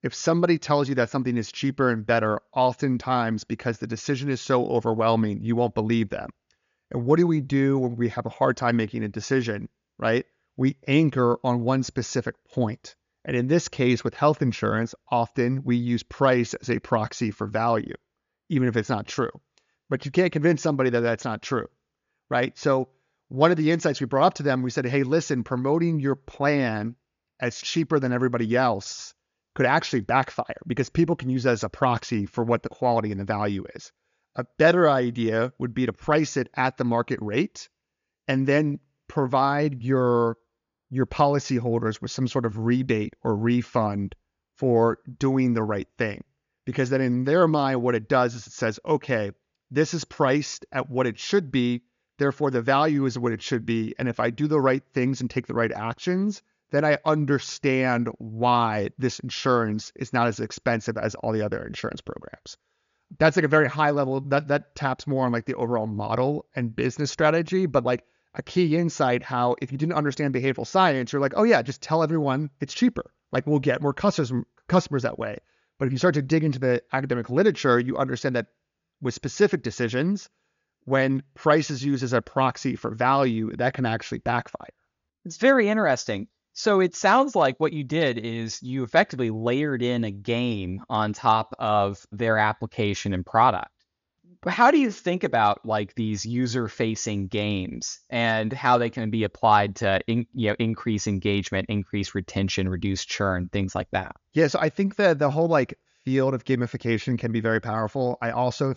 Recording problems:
high frequencies cut off; noticeable; nothing above 7 kHz

